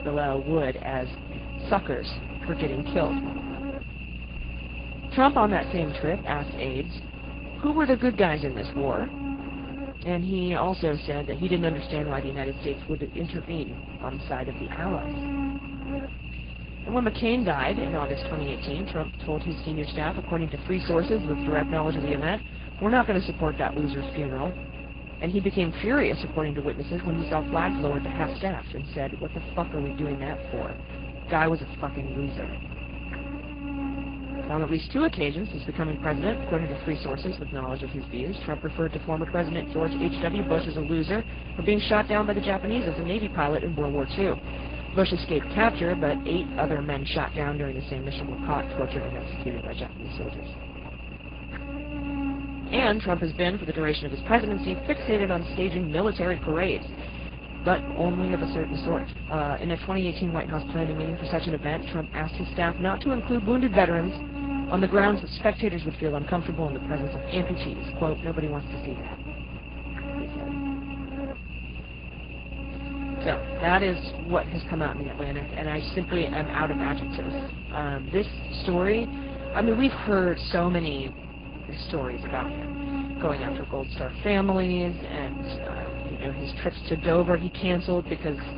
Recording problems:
garbled, watery; badly
high frequencies cut off; severe; nothing above 5 kHz
electrical hum; noticeable; throughout; 60 Hz, 10 dB below the speech

